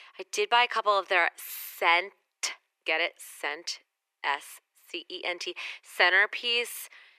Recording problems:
thin; very; fading below 350 Hz

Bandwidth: 14.5 kHz